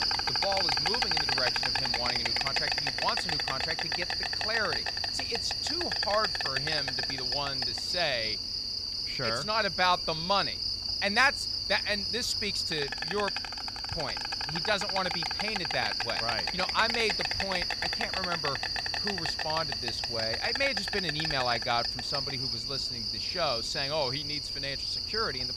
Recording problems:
animal sounds; very loud; throughout; 4 dB above the speech

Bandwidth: 14.5 kHz